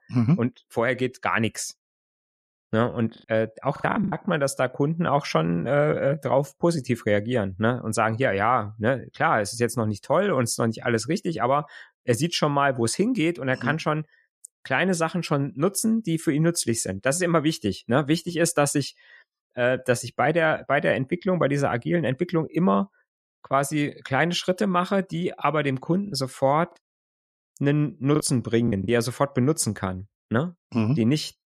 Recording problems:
choppy; very; at 4 s and from 26 to 29 s; 9% of the speech affected

